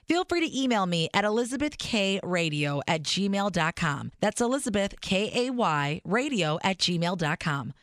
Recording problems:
none

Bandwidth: 14.5 kHz